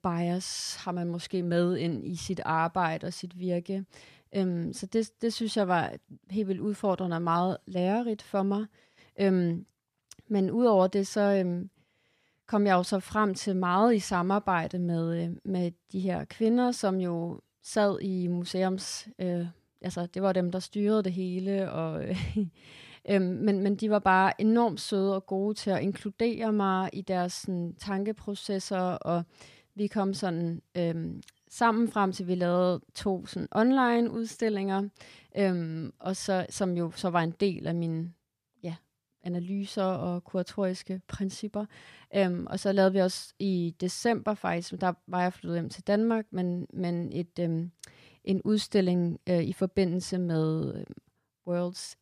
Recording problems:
none

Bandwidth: 14.5 kHz